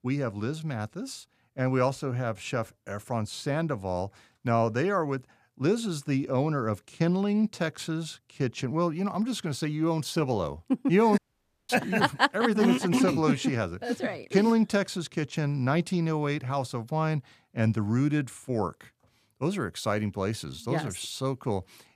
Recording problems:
audio cutting out; at 11 s for 0.5 s

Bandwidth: 14.5 kHz